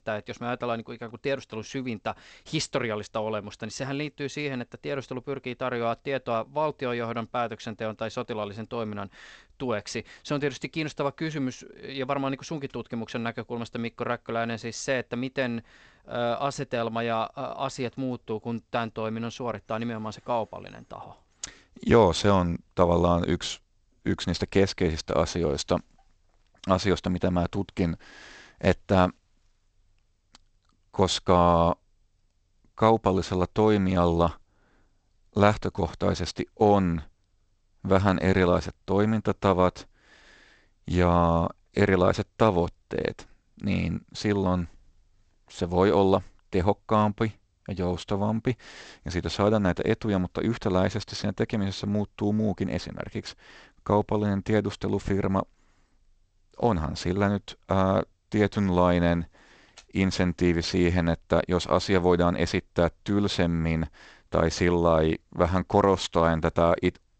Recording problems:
garbled, watery; slightly; nothing above 8 kHz

